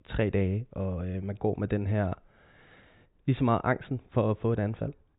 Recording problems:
high frequencies cut off; severe; nothing above 4 kHz

